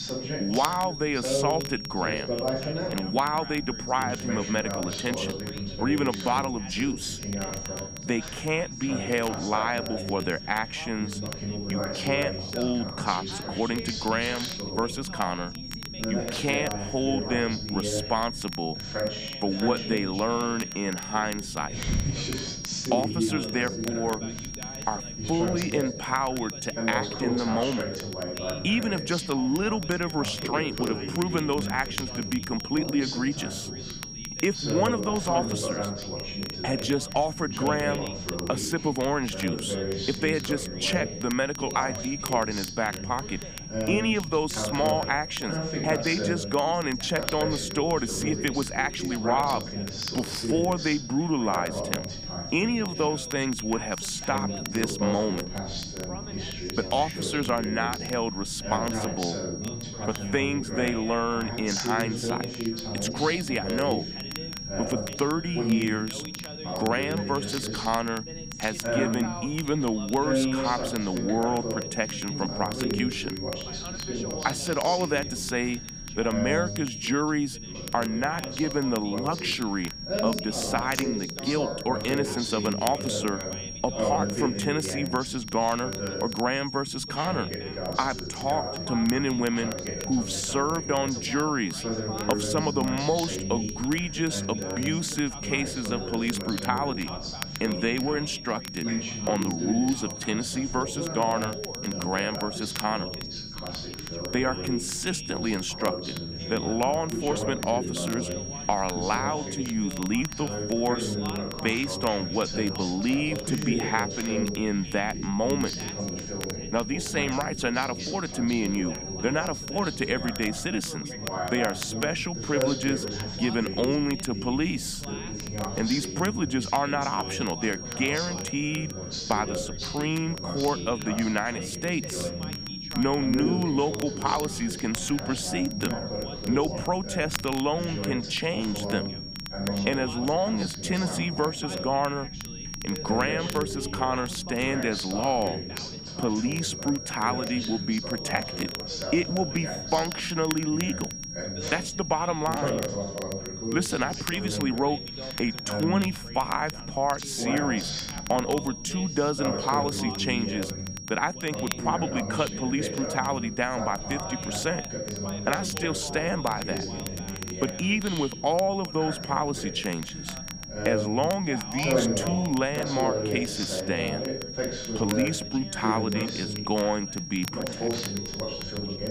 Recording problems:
high-pitched whine; loud; throughout; 5.5 kHz, 9 dB below the speech
background chatter; loud; throughout; 2 voices, 6 dB below the speech
crackle, like an old record; noticeable; 15 dB below the speech
low rumble; faint; throughout; 20 dB below the speech

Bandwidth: 15 kHz